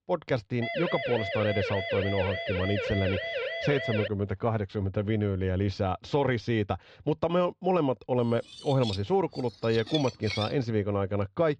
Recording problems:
muffled; slightly; fading above 4 kHz
siren; noticeable; from 0.5 to 4 s; peak 2 dB below the speech
clattering dishes; noticeable; from 8.5 to 11 s; peak 6 dB below the speech

